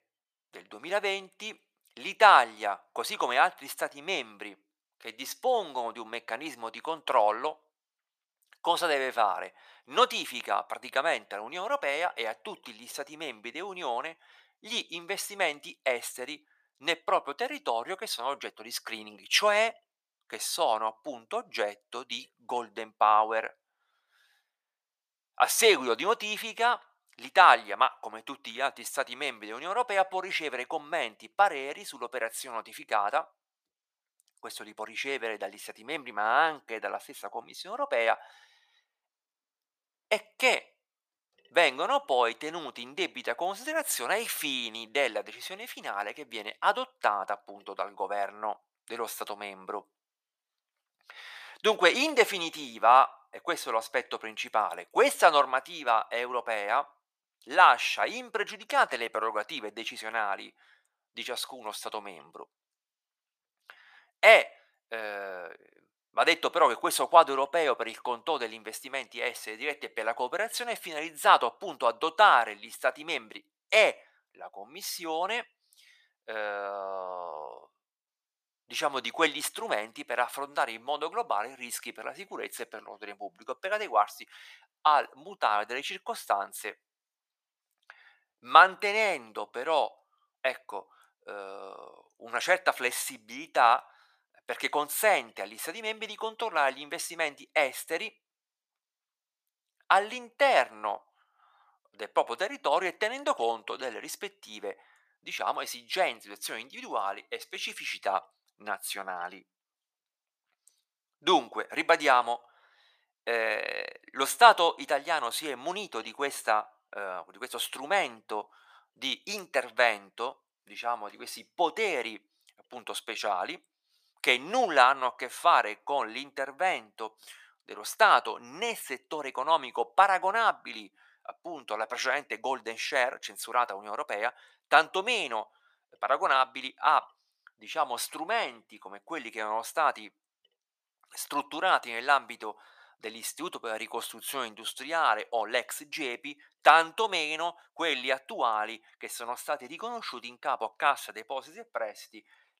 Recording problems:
thin; very; fading below 750 Hz

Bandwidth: 14.5 kHz